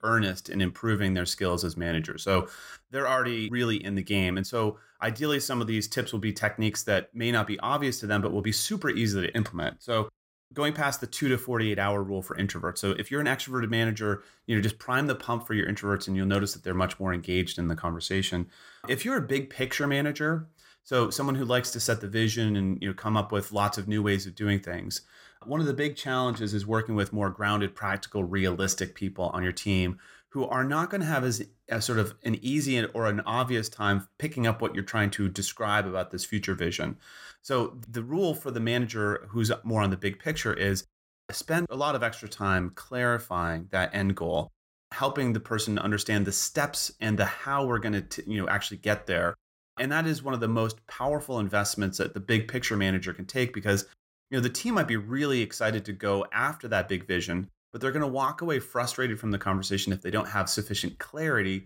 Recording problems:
none

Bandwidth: 16 kHz